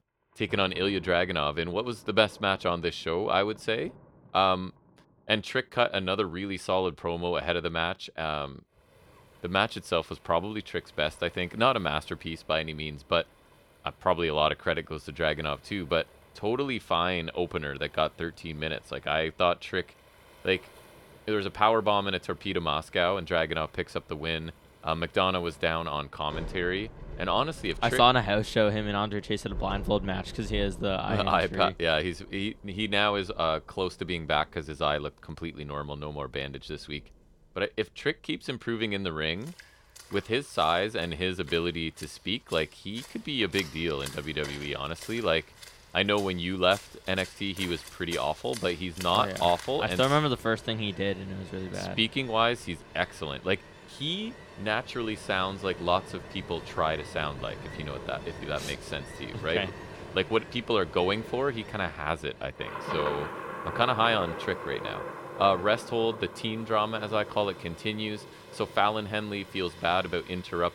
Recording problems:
rain or running water; noticeable; throughout; 15 dB below the speech

